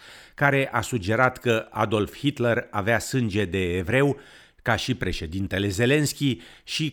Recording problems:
none

